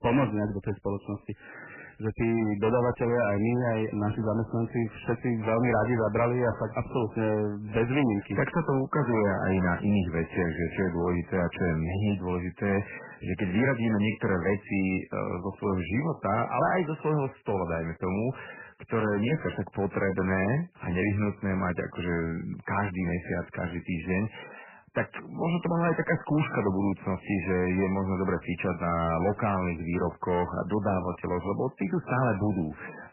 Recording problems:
garbled, watery; badly; nothing above 3 kHz
distortion; slight; 10 dB below the speech

